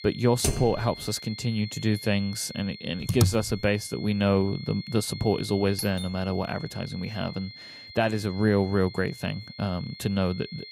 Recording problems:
high-pitched whine; noticeable; throughout; 4.5 kHz, 15 dB below the speech
keyboard typing; noticeable; at 0.5 s; peak 2 dB below the speech
keyboard typing; loud; at 3 s; peak 1 dB above the speech
doorbell; noticeable; at 6 s; peak 8 dB below the speech

